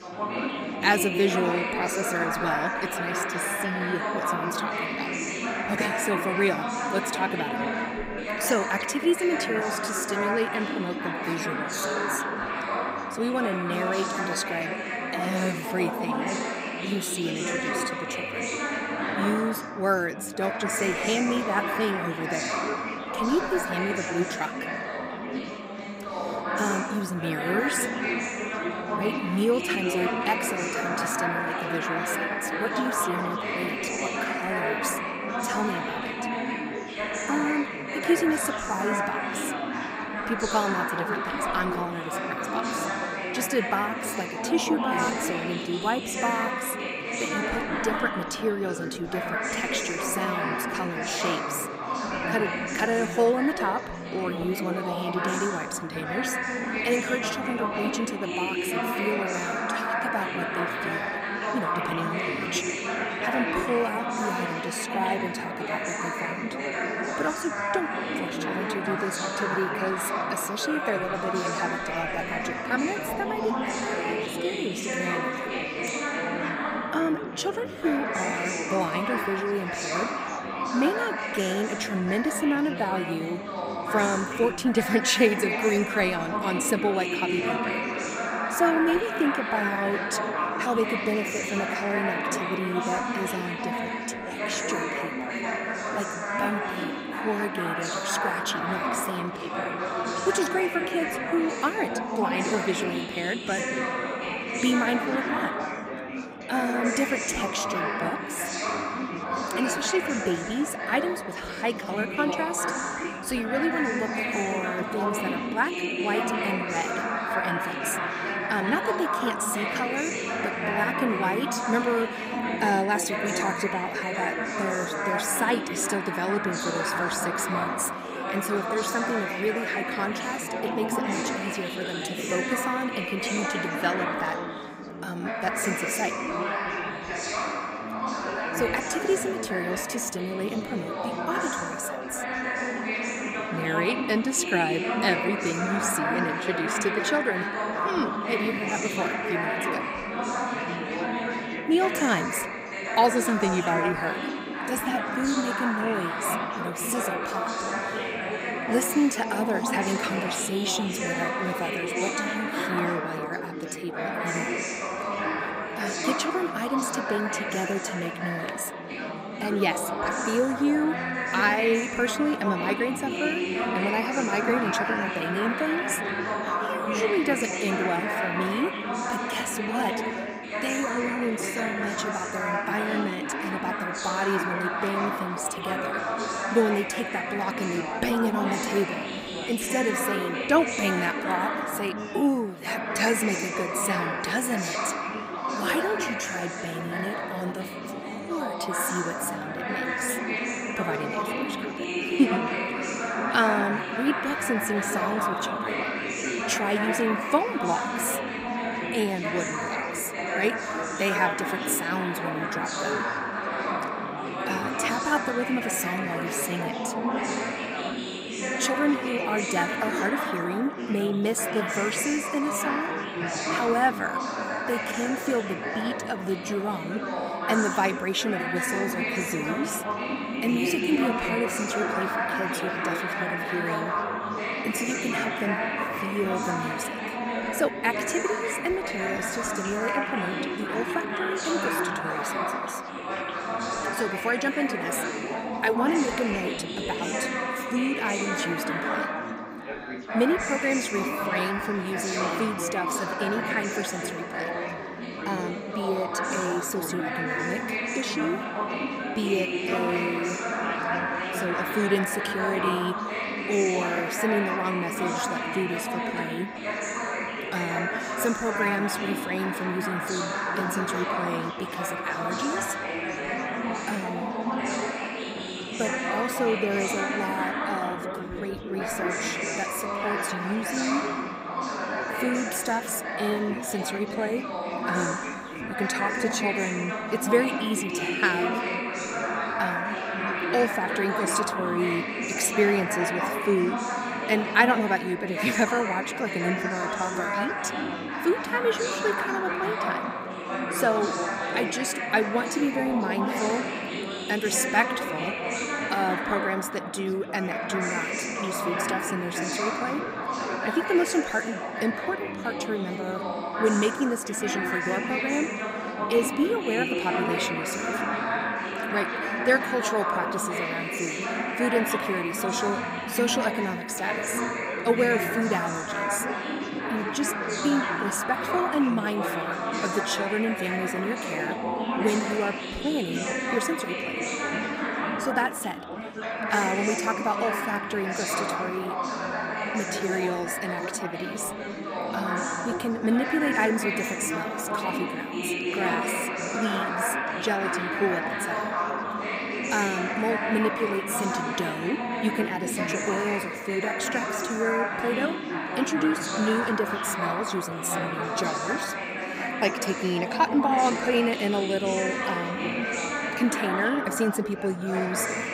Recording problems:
chatter from many people; very loud; throughout; as loud as the speech

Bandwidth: 15.5 kHz